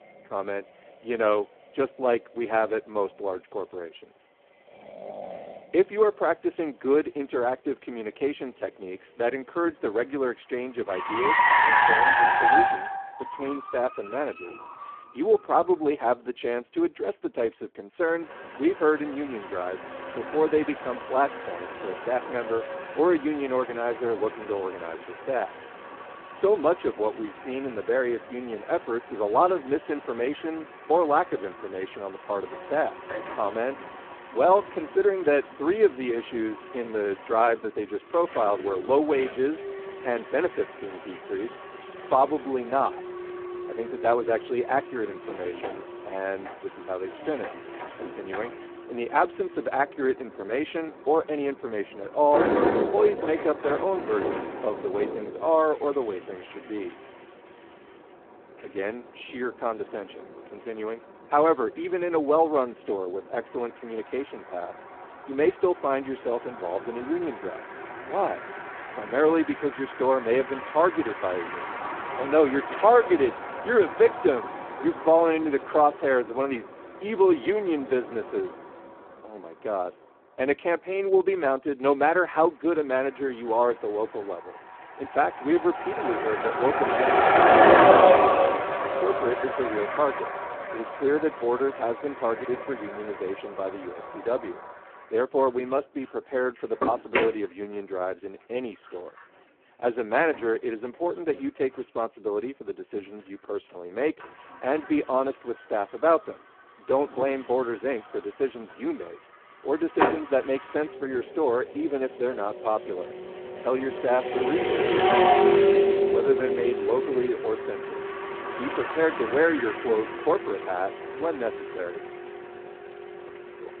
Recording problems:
phone-call audio; poor line
traffic noise; loud; throughout; as loud as the speech

